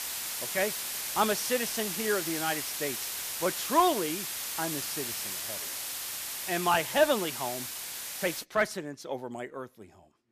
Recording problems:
hiss; loud; until 8.5 s; 2 dB below the speech

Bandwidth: 14.5 kHz